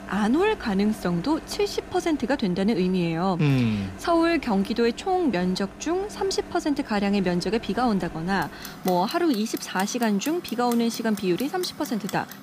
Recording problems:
household noises; noticeable; throughout; 15 dB below the speech

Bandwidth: 15 kHz